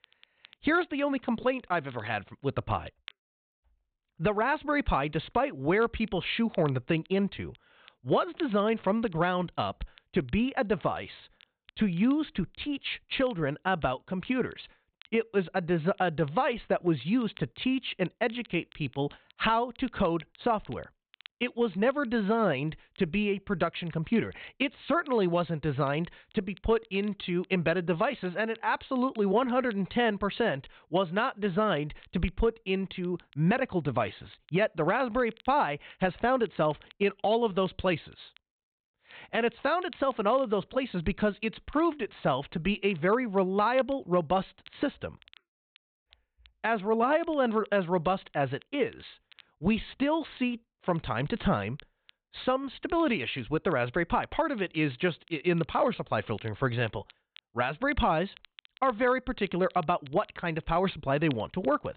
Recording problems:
high frequencies cut off; severe; nothing above 4 kHz
crackle, like an old record; faint; 25 dB below the speech

